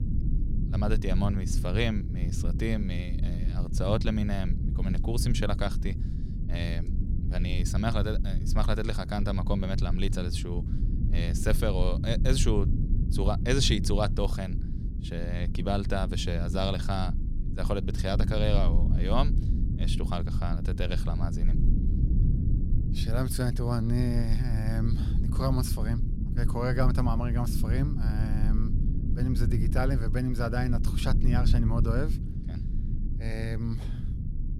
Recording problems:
low rumble; loud; throughout; 9 dB below the speech

